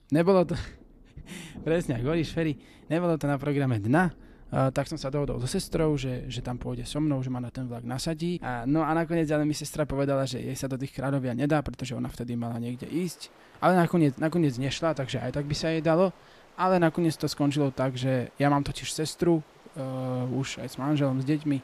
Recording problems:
rain or running water; faint; throughout; 25 dB below the speech

